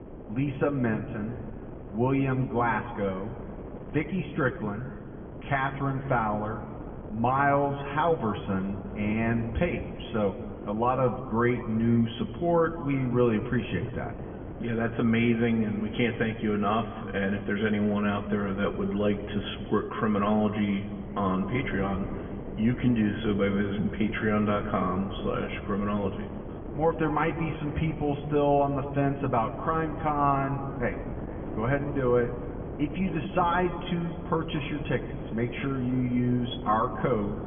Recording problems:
off-mic speech; far
high frequencies cut off; severe; nothing above 3.5 kHz
room echo; slight; dies away in 1.8 s
wind noise on the microphone; occasional gusts; 15 dB below the speech

